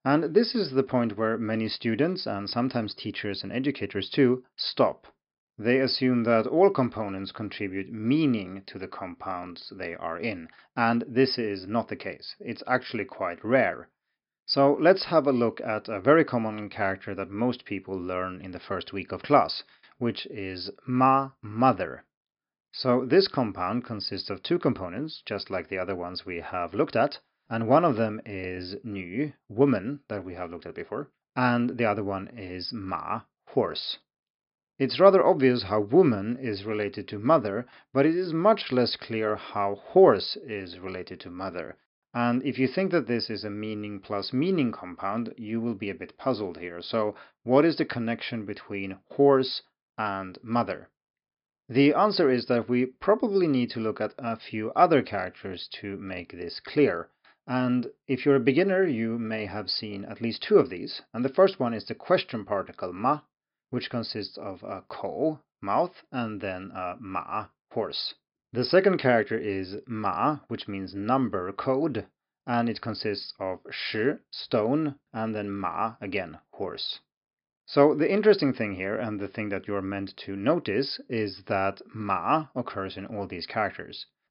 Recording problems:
high frequencies cut off; noticeable; nothing above 5.5 kHz

